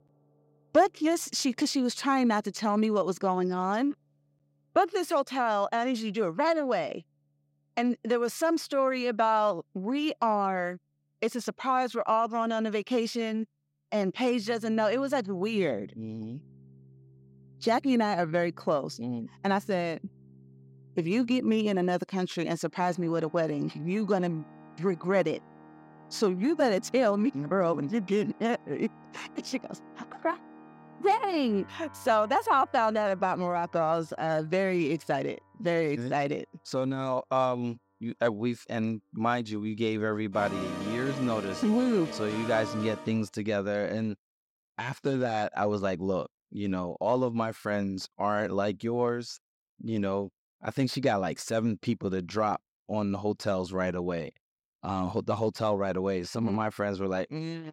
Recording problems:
background music; noticeable; until 43 s; 15 dB below the speech

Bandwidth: 16 kHz